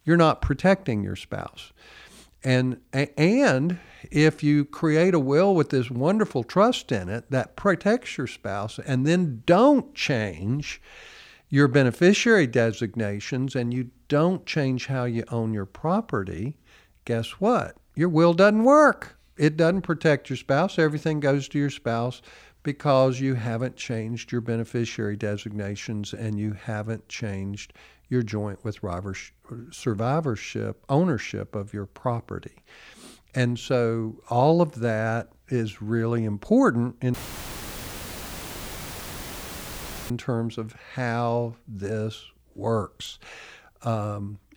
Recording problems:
audio cutting out; filled with static; at 37 s for 3 s

